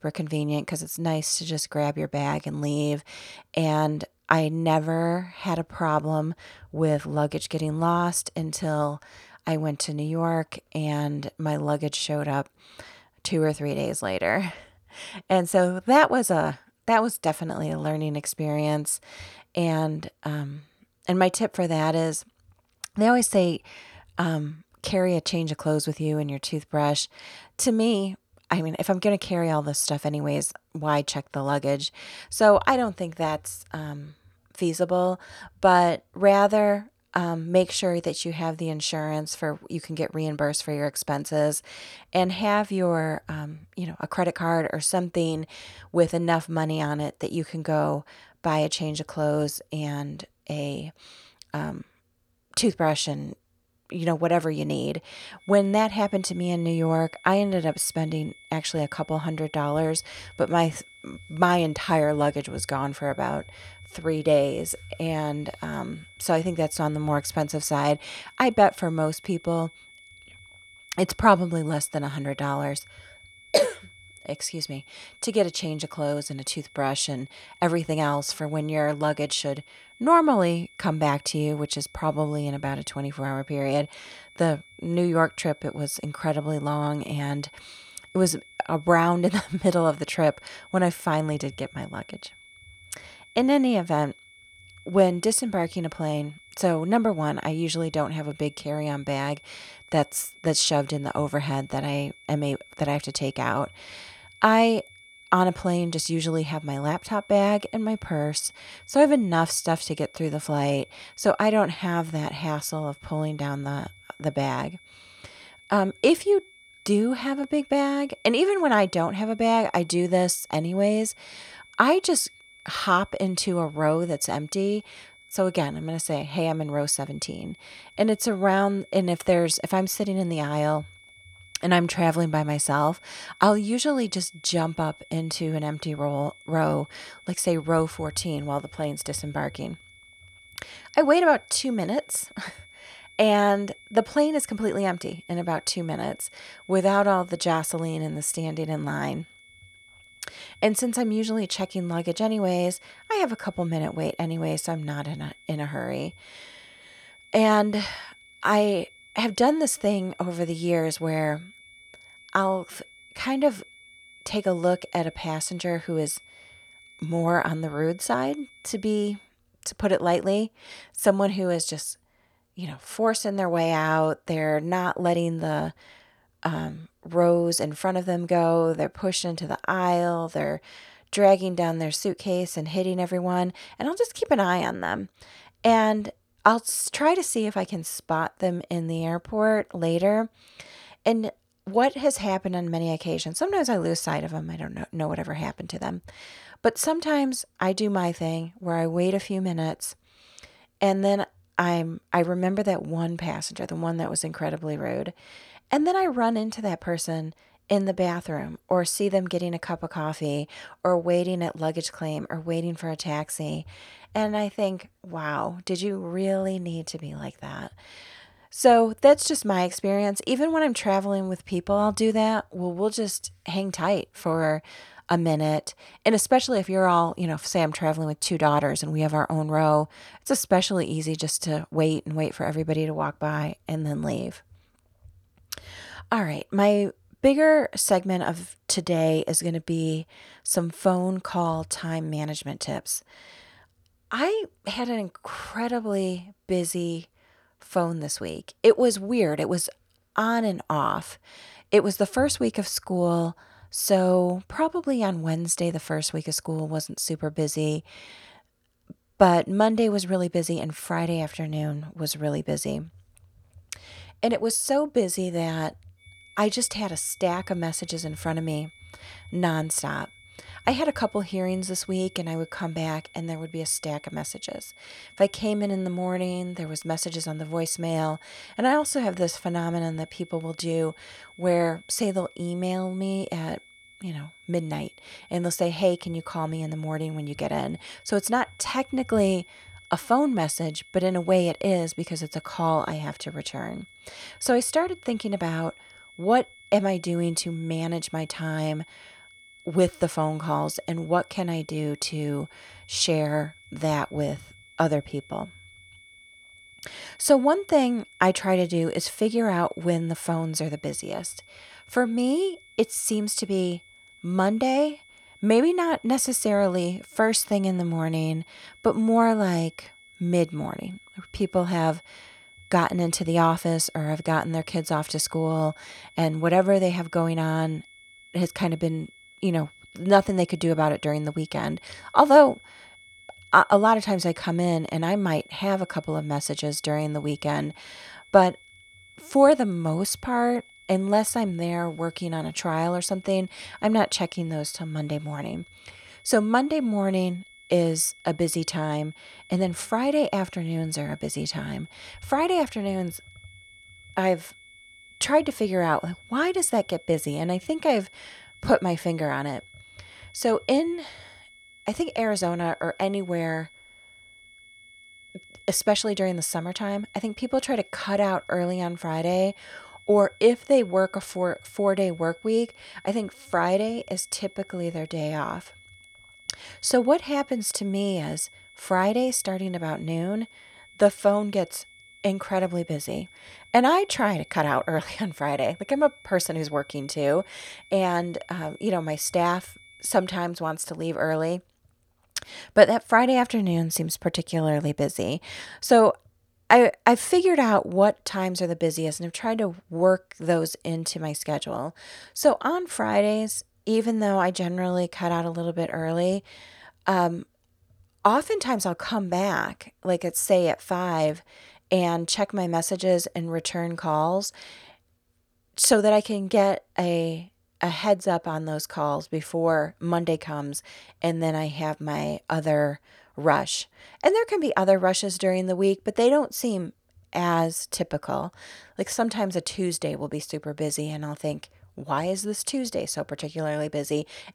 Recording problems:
high-pitched whine; faint; from 55 s to 2:49 and from 4:26 to 6:30; 2 kHz, 25 dB below the speech

